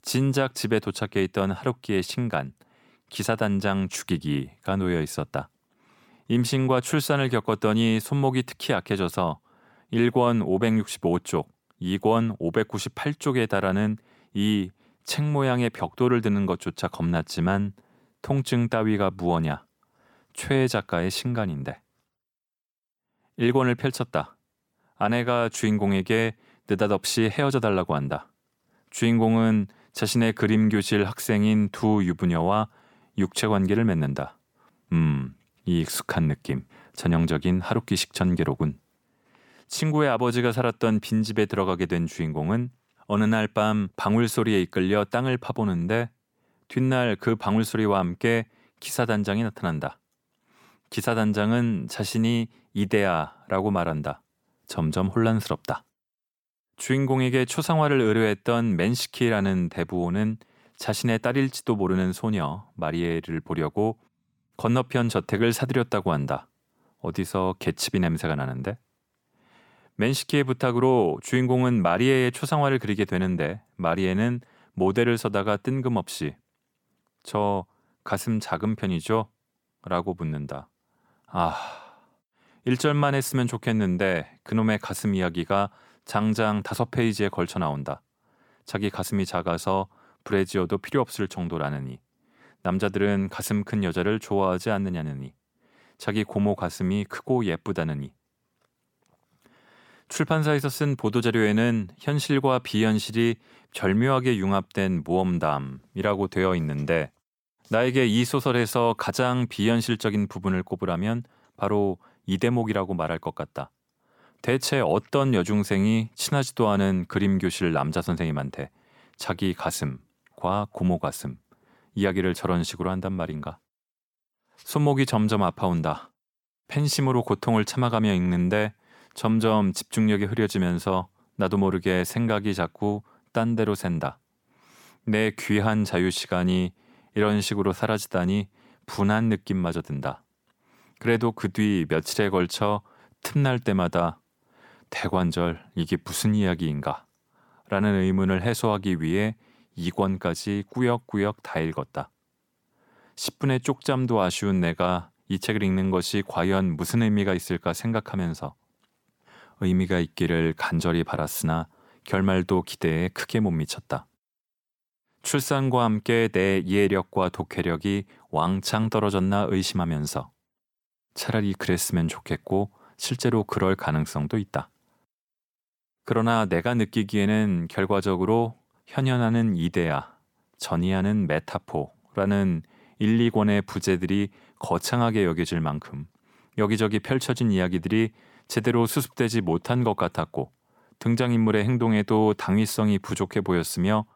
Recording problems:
none

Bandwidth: 18 kHz